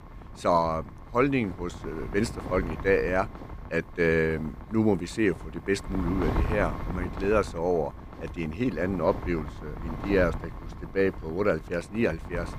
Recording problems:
wind noise on the microphone; occasional gusts; 15 dB below the speech

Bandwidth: 15 kHz